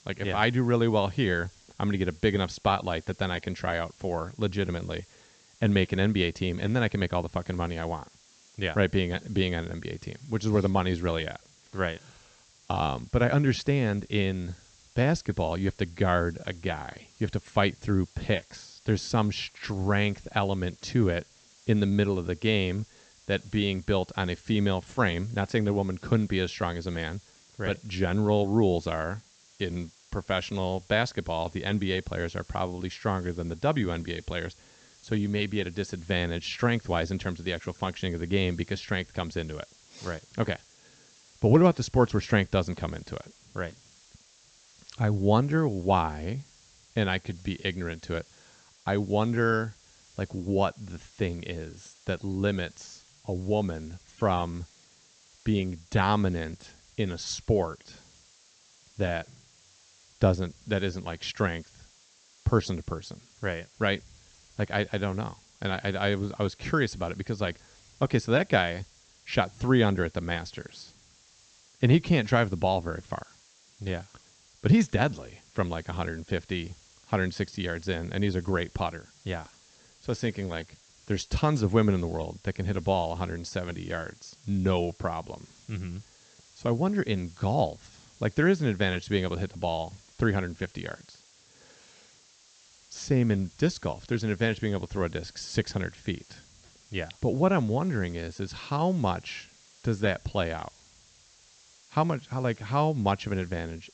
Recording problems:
high frequencies cut off; noticeable; nothing above 8 kHz
hiss; faint; throughout; 25 dB below the speech

